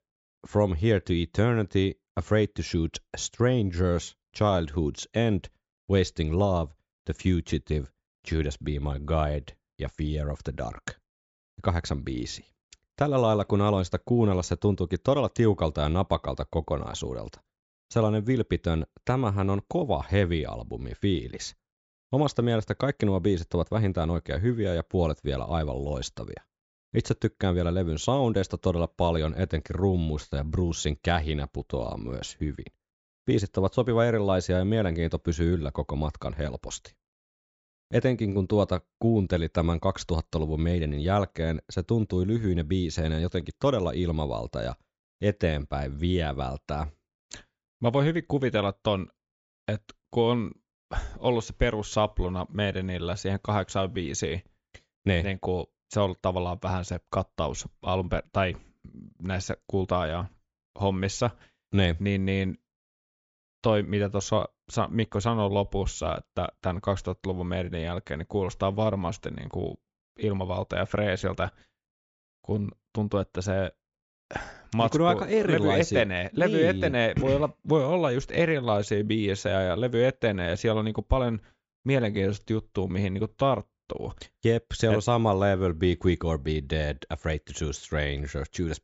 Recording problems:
high frequencies cut off; noticeable; nothing above 8 kHz

